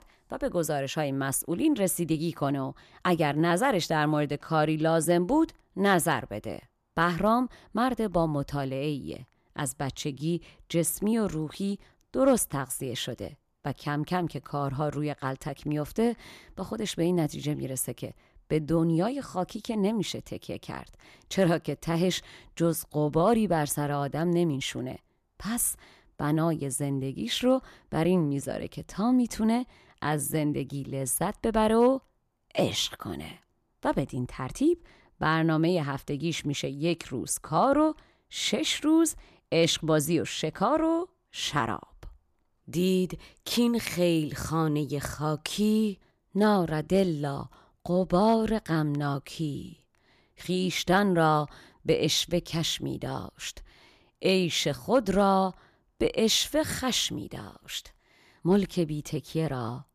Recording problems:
none

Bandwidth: 14.5 kHz